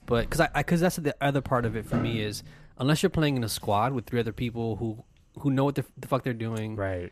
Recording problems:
household noises; noticeable; throughout; 10 dB below the speech

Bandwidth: 14.5 kHz